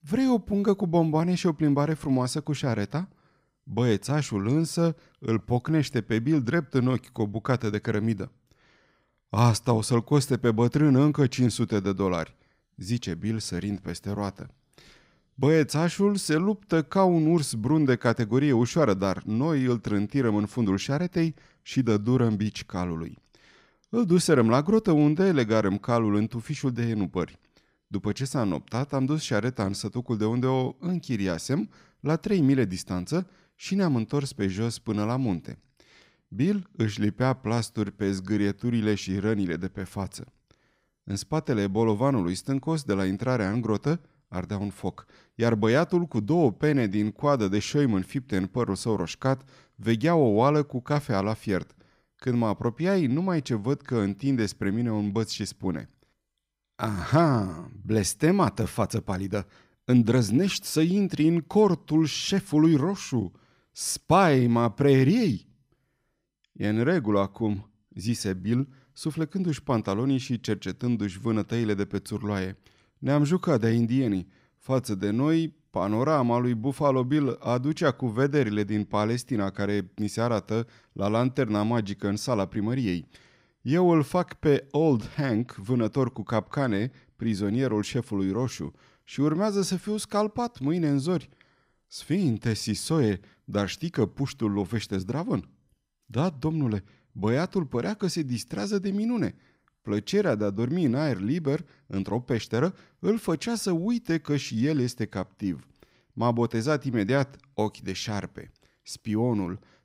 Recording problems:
none

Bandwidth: 15.5 kHz